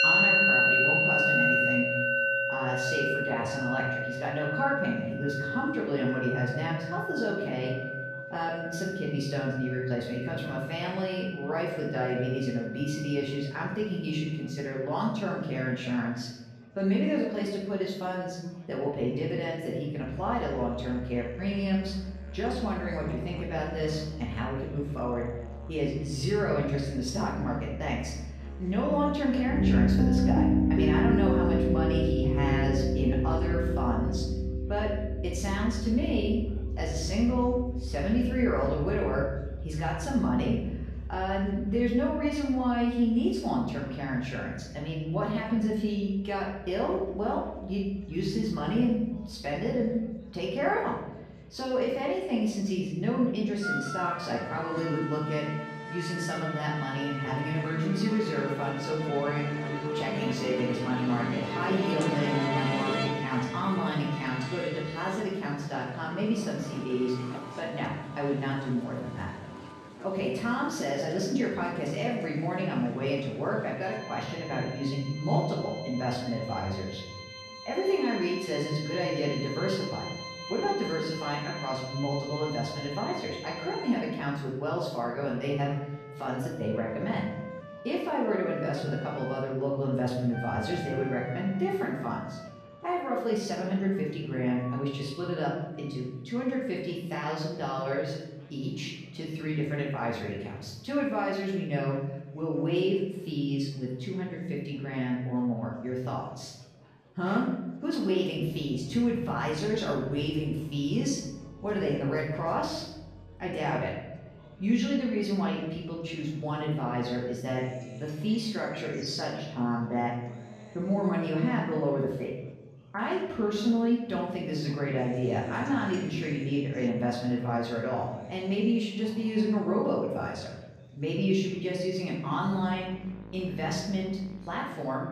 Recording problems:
off-mic speech; far
room echo; noticeable; dies away in 0.9 s
background music; loud; throughout; 2 dB below the speech
chatter from many people; faint; throughout; 25 dB below the speech

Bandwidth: 14.5 kHz